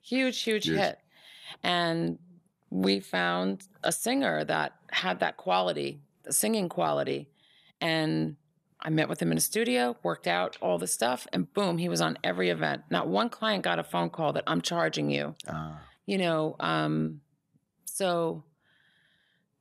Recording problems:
none

